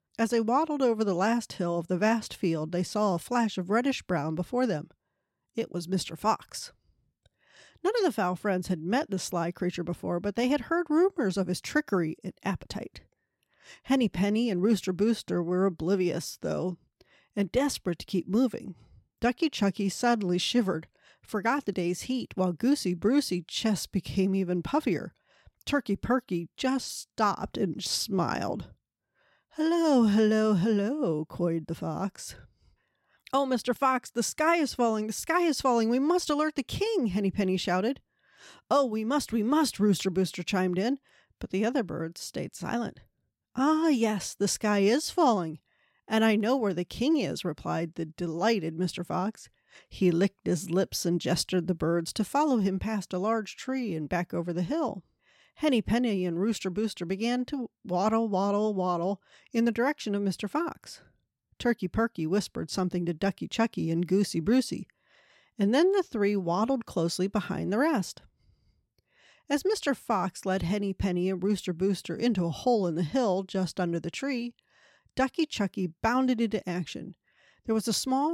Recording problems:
abrupt cut into speech; at the end

